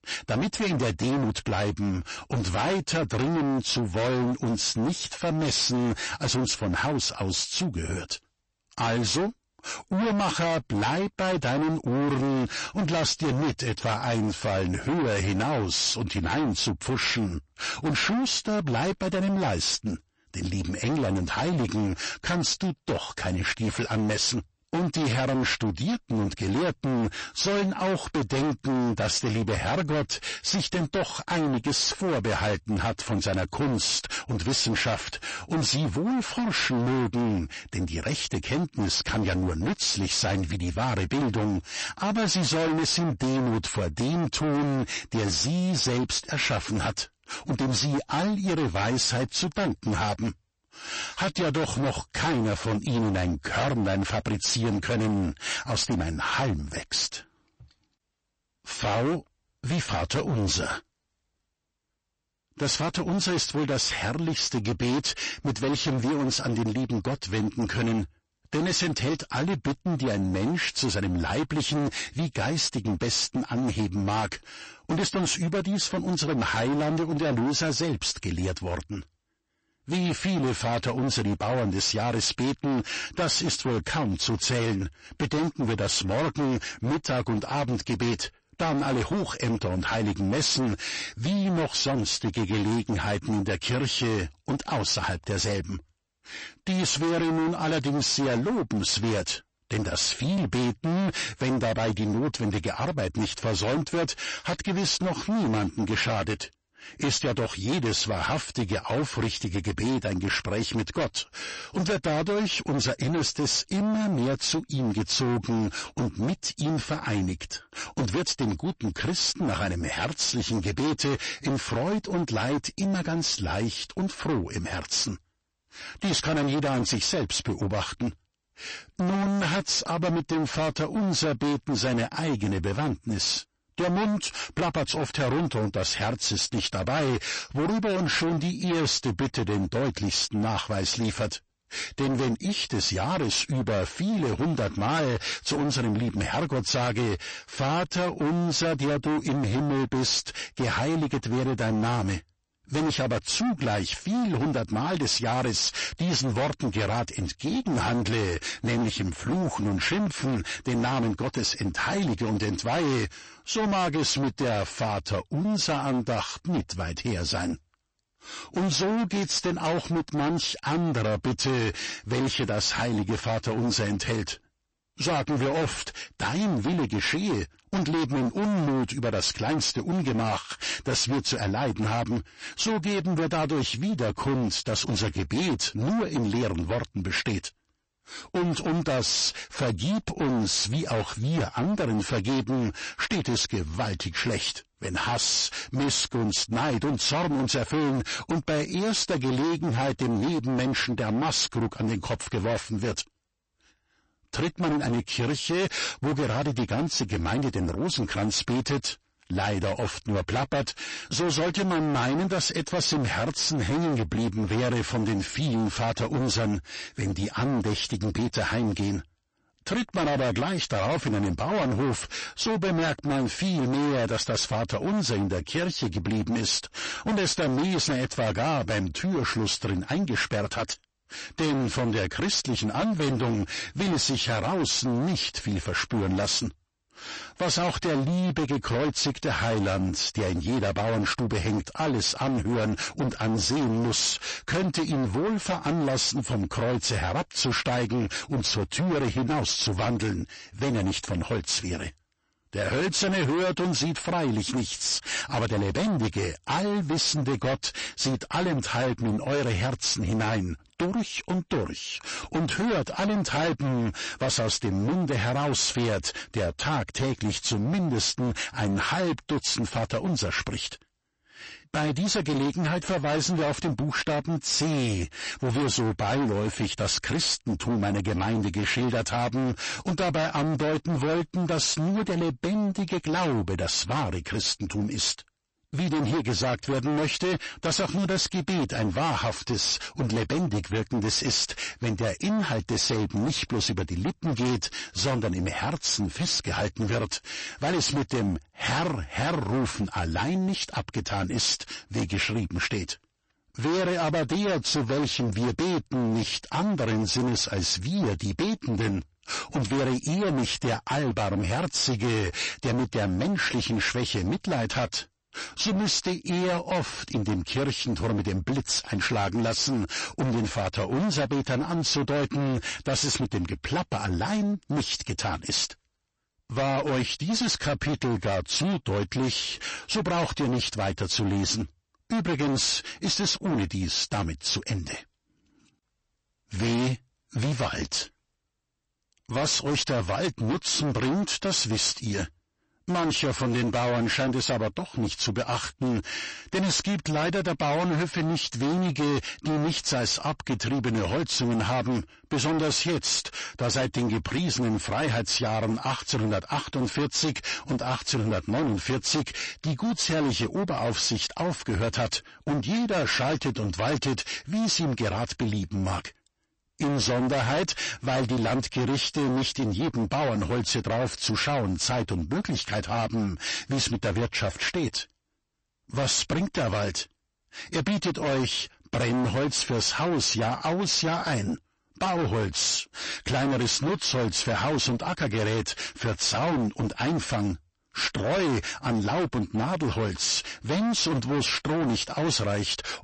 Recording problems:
distortion; heavy; 30% of the sound clipped
garbled, watery; slightly; nothing above 8 kHz

